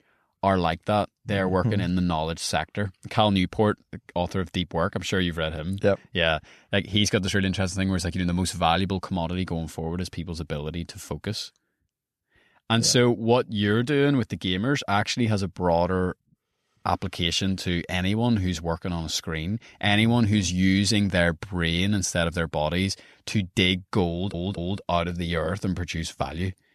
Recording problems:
audio stuttering; at 24 s

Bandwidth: 13.5 kHz